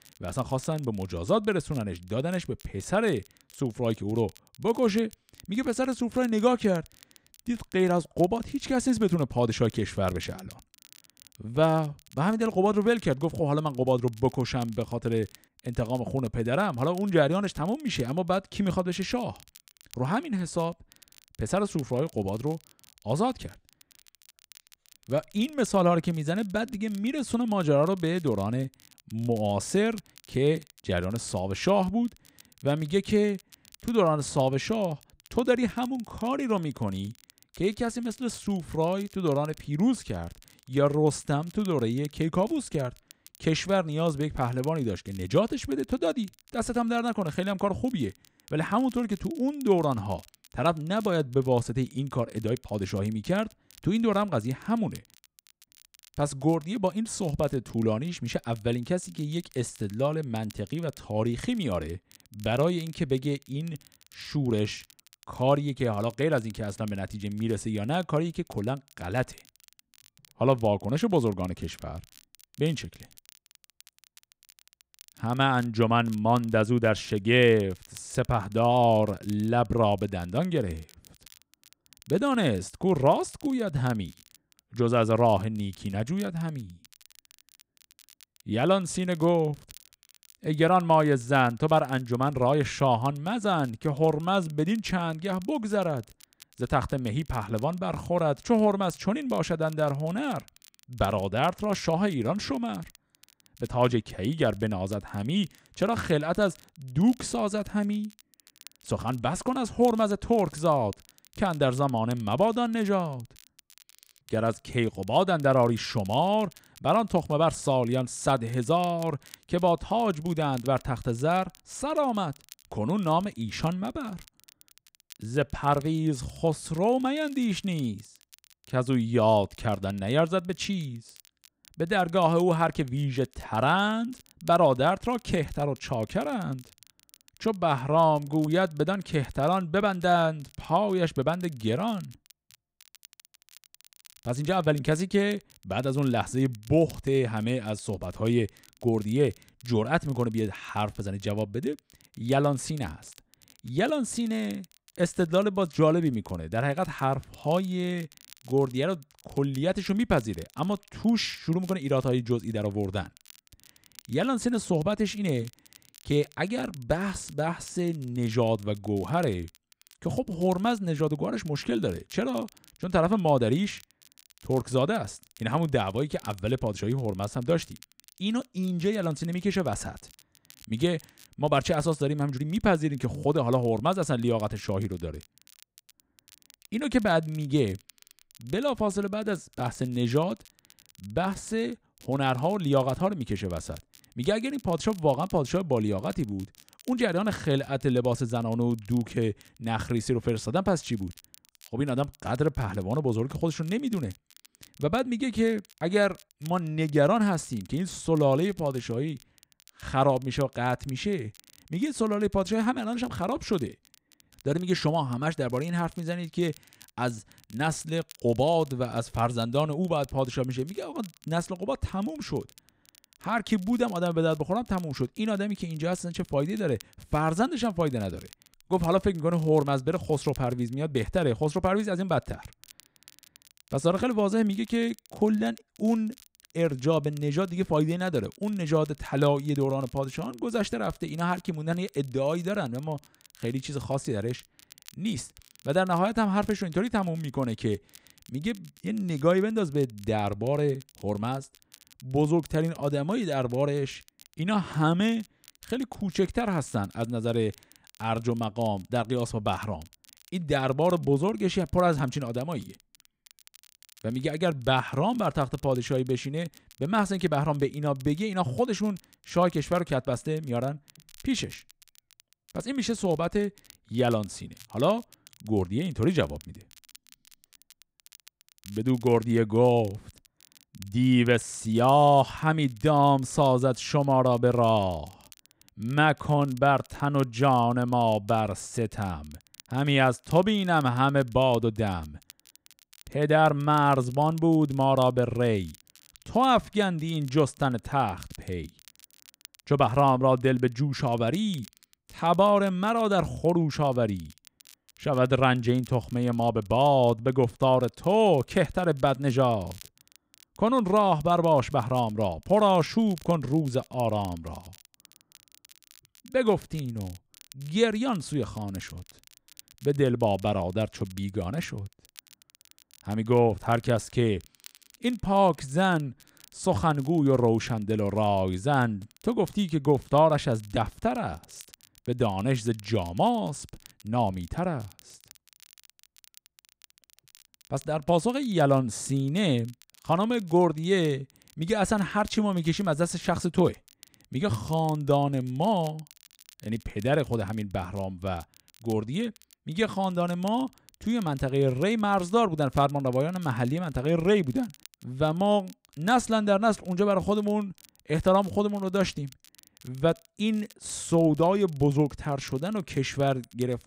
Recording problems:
crackle, like an old record; faint; 25 dB below the speech

